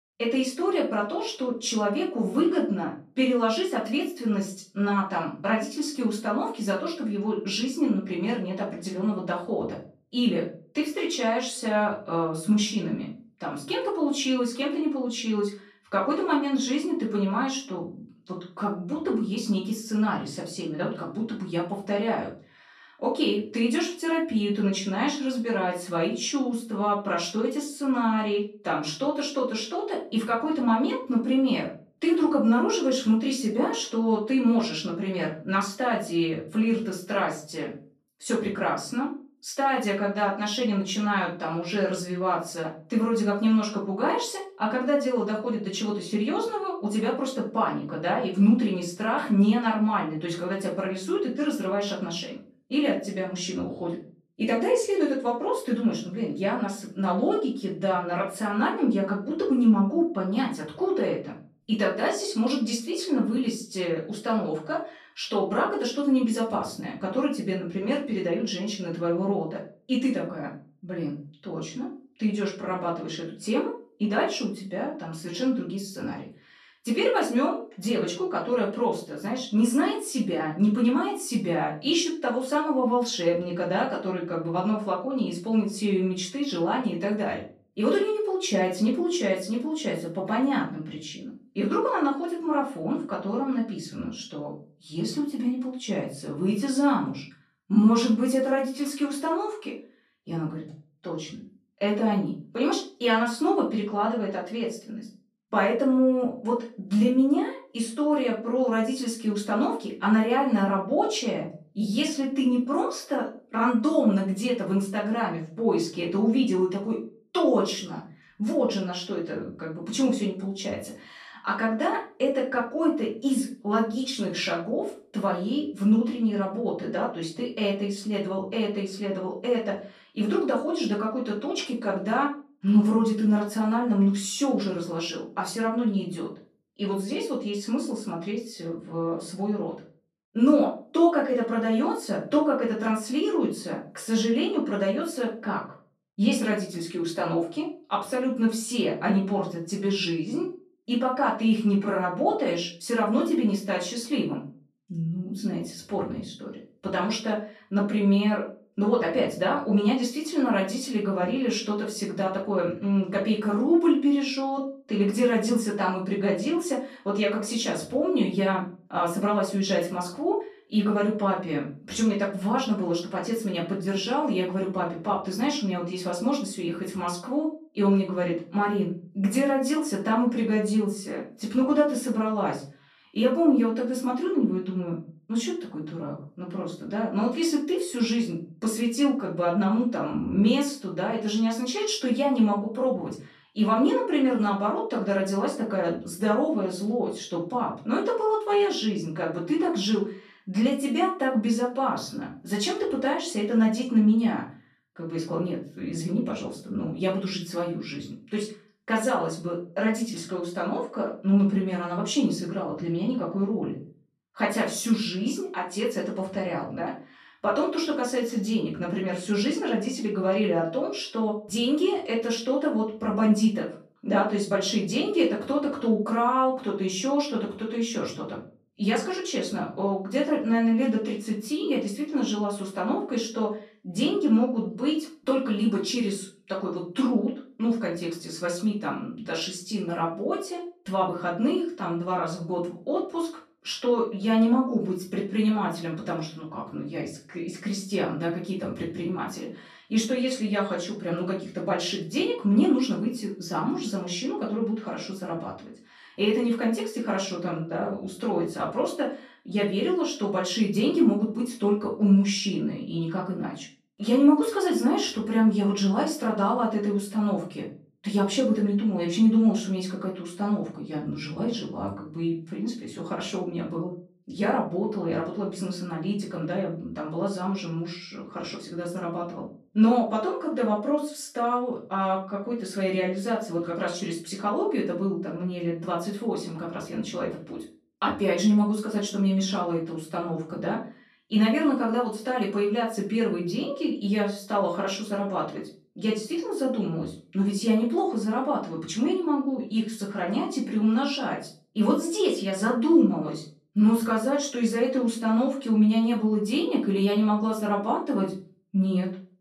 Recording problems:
off-mic speech; far
room echo; slight; dies away in 0.3 s

